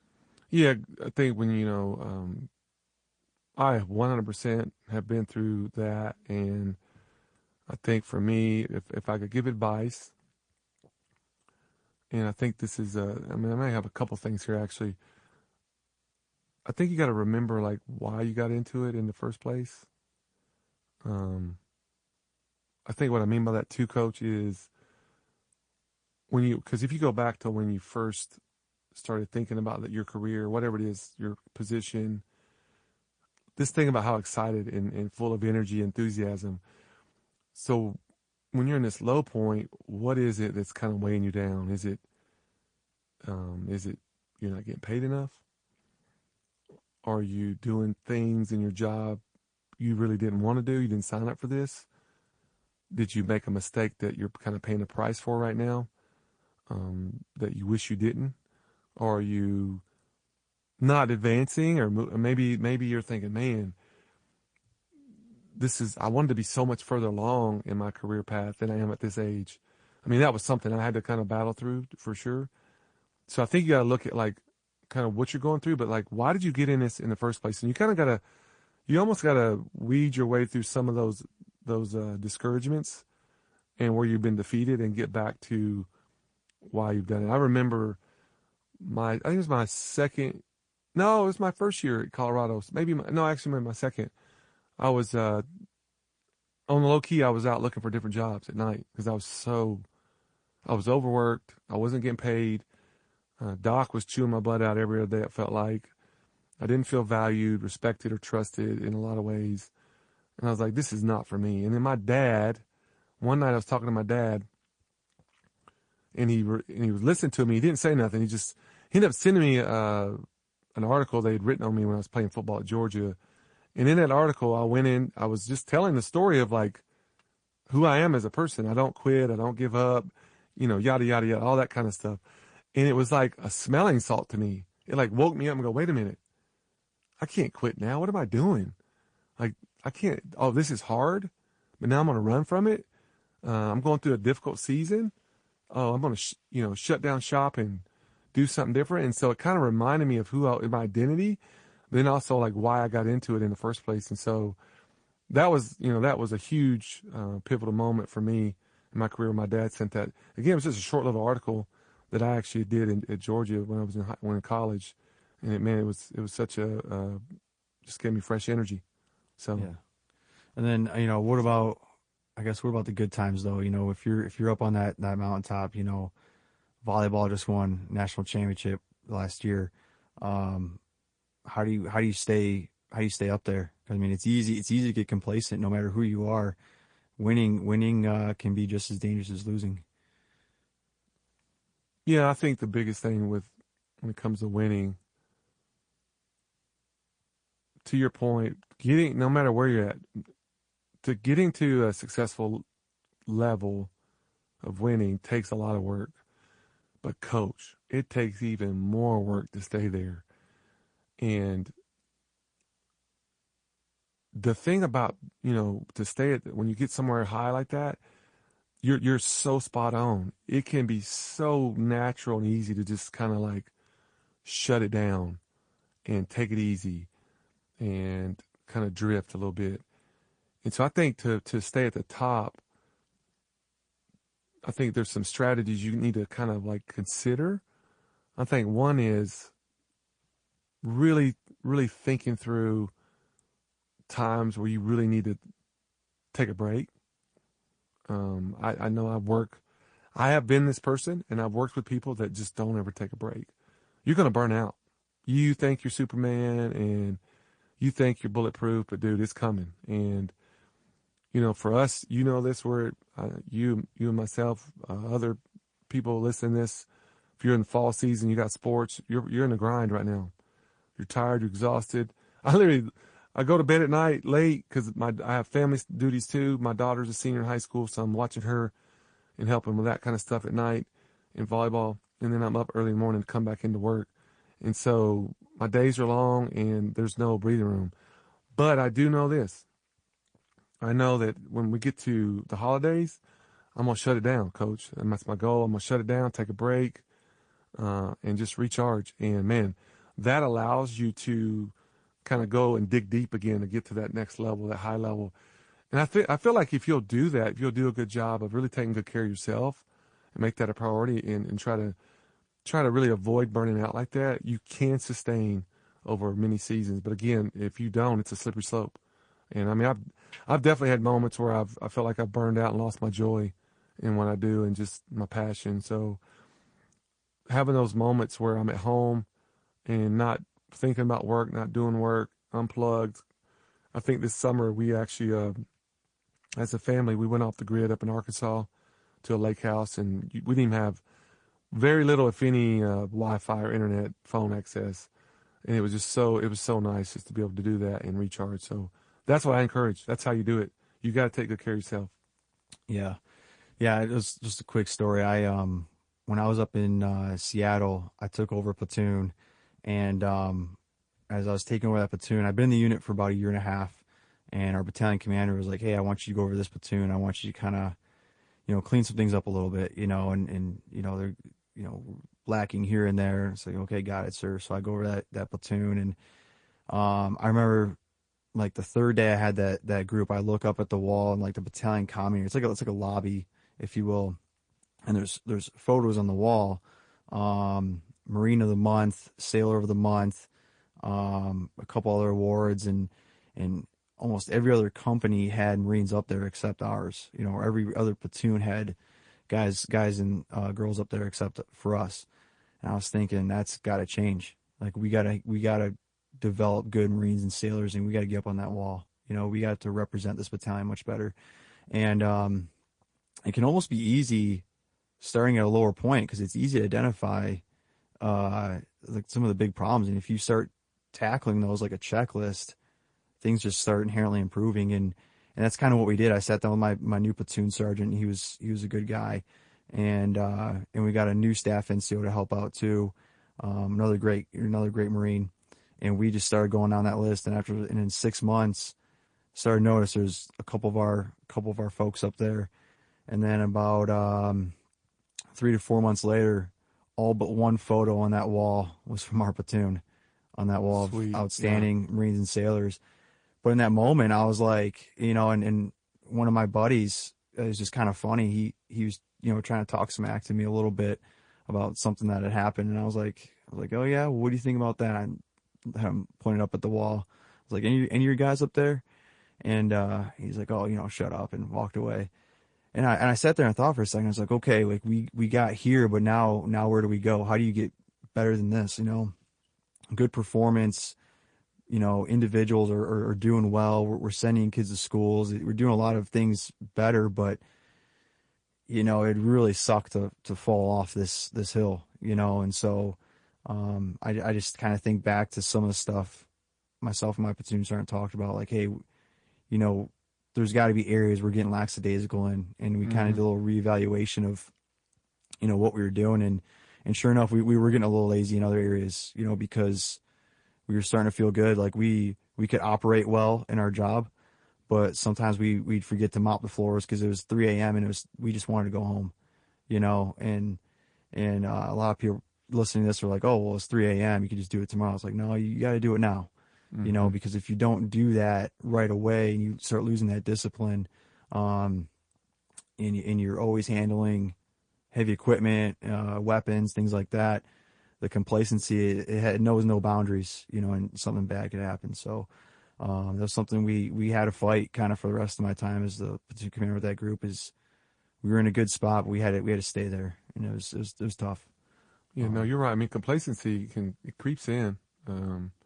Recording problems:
garbled, watery; slightly; nothing above 9.5 kHz

